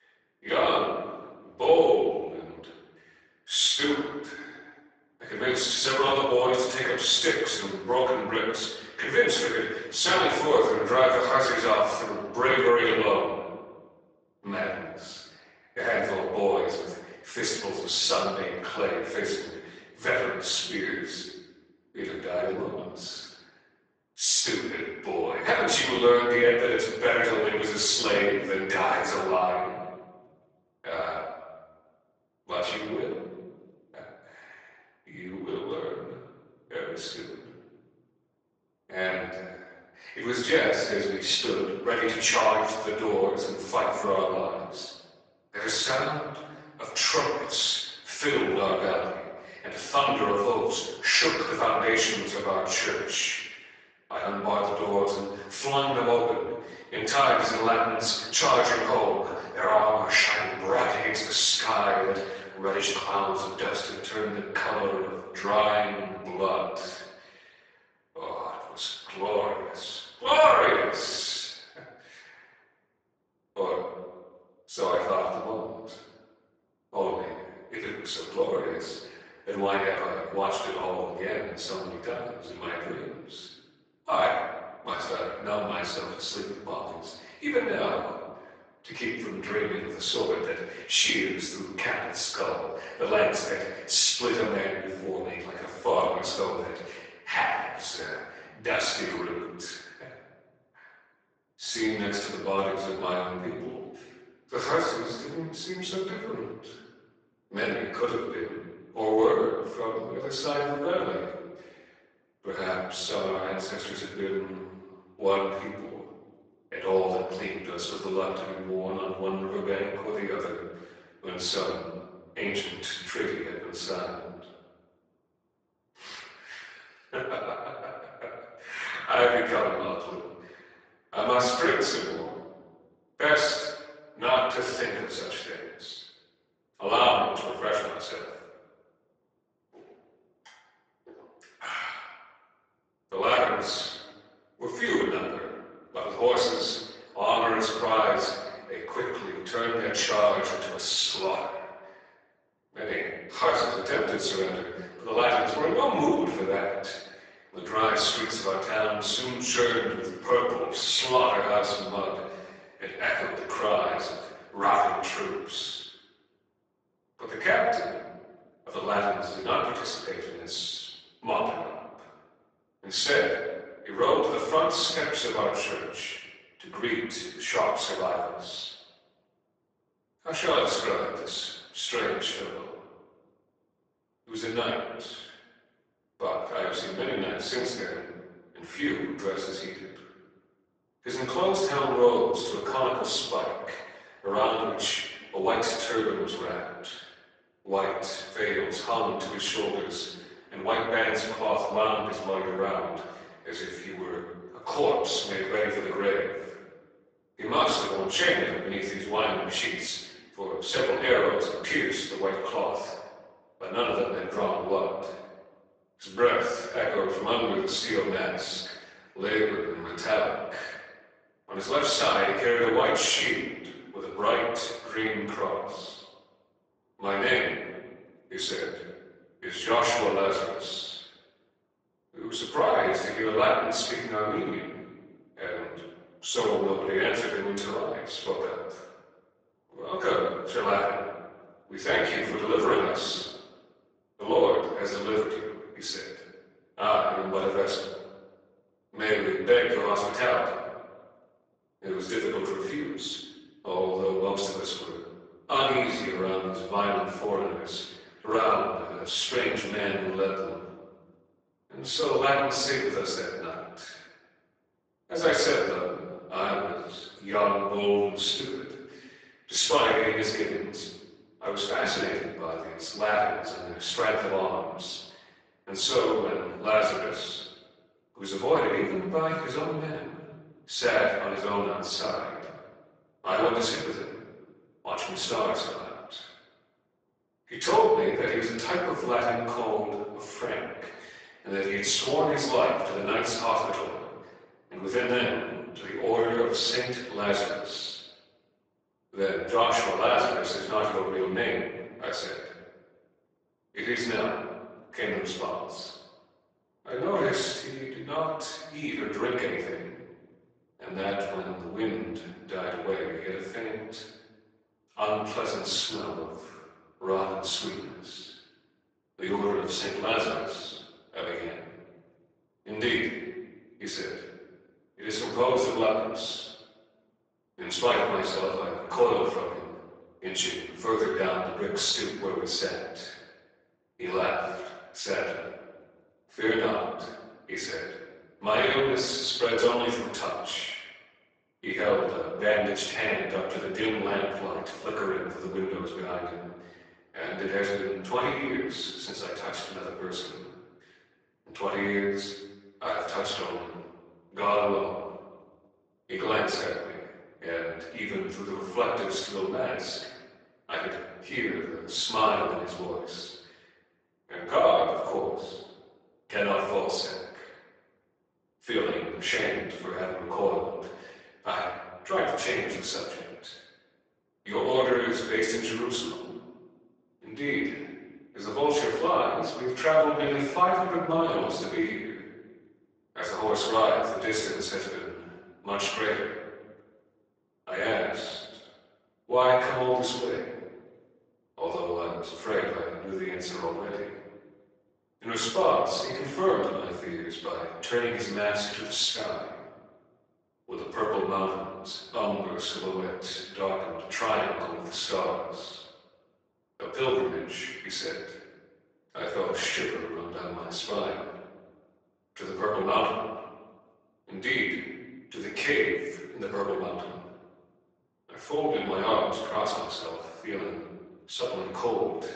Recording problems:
off-mic speech; far
garbled, watery; badly; nothing above 8 kHz
room echo; noticeable; dies away in 1.2 s
thin; somewhat; fading below 450 Hz

